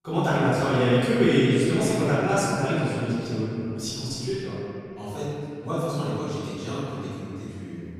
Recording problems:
room echo; strong; dies away in 2.8 s
off-mic speech; far

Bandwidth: 14.5 kHz